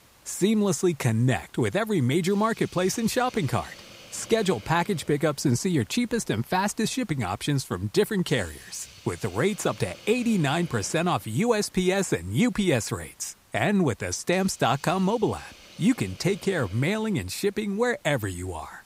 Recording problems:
hiss; faint; throughout; 25 dB below the speech

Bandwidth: 15.5 kHz